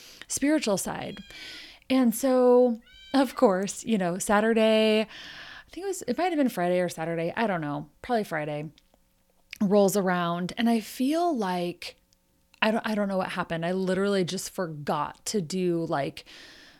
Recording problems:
animal sounds; faint; throughout; 25 dB below the speech

